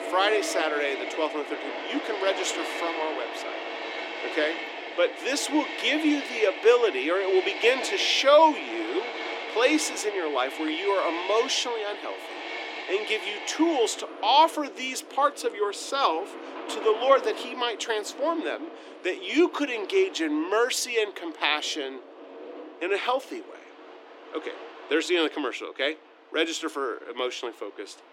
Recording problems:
thin; very slightly; fading below 300 Hz
train or aircraft noise; loud; throughout; 9 dB below the speech

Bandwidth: 16.5 kHz